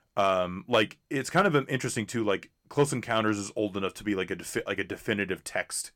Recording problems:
none

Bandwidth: 17.5 kHz